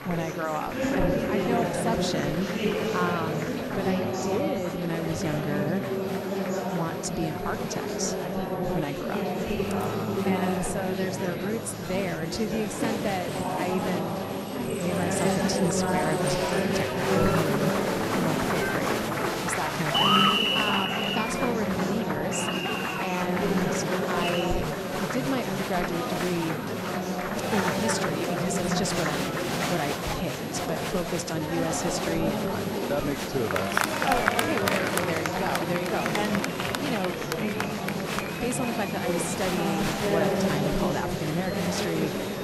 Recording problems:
murmuring crowd; very loud; throughout; 4 dB above the speech
high-pitched whine; noticeable; throughout; 11.5 kHz, 20 dB below the speech

